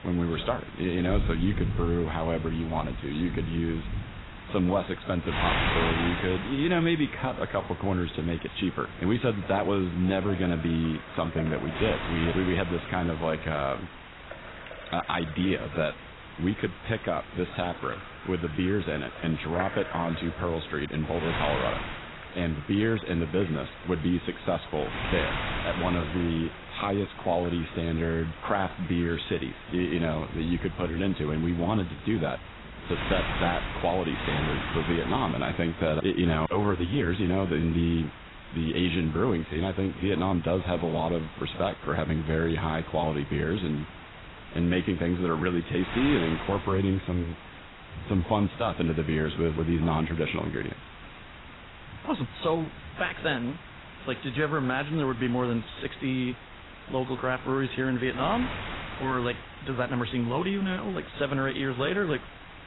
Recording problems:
garbled, watery; badly; nothing above 4 kHz
wind noise on the microphone; heavy; 8 dB below the speech
rain or running water; noticeable; throughout; 15 dB below the speech

